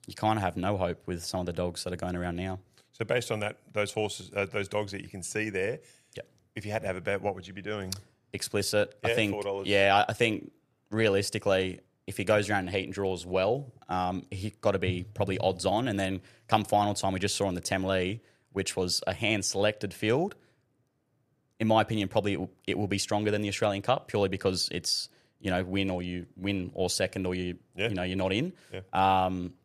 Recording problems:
none

